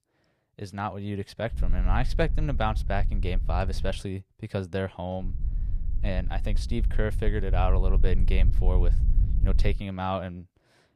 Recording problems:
low rumble; noticeable; from 1.5 to 4 s and from 5 to 10 s; 15 dB below the speech

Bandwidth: 15 kHz